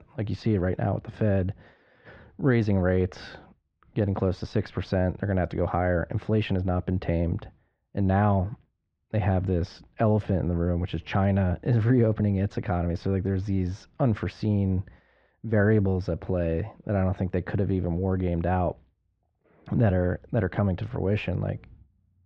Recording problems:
muffled; very; fading above 2.5 kHz

